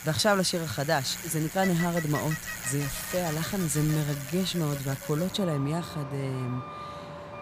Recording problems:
traffic noise; loud; throughout; 8 dB below the speech

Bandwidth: 15 kHz